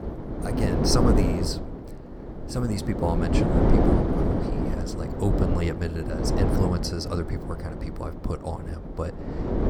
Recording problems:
wind noise on the microphone; heavy; 3 dB above the speech

